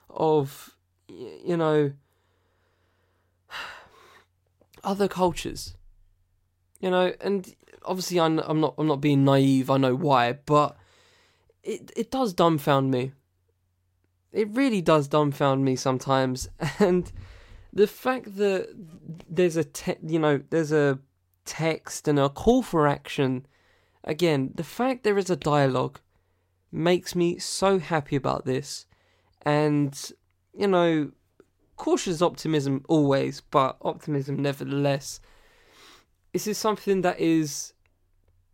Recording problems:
none

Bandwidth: 16 kHz